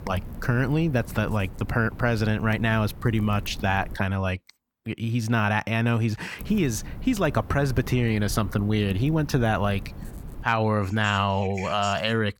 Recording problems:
wind noise on the microphone; occasional gusts; until 4 s and from 6.5 to 10 s; 20 dB below the speech

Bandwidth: 17.5 kHz